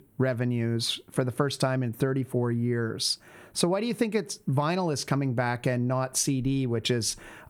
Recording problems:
squashed, flat; somewhat

